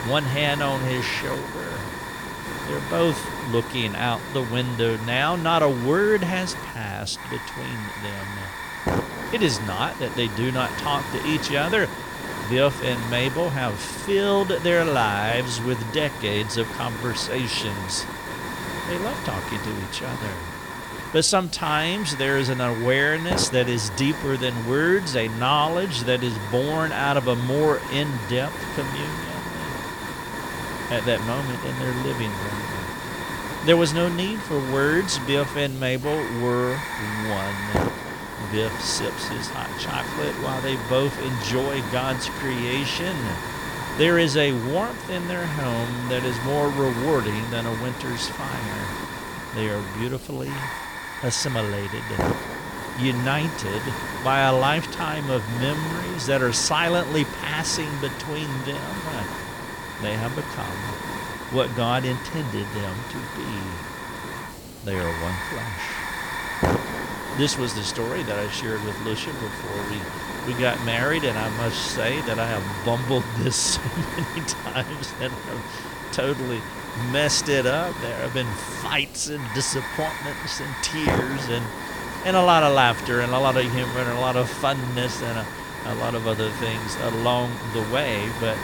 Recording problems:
hiss; loud; throughout; 6 dB below the speech

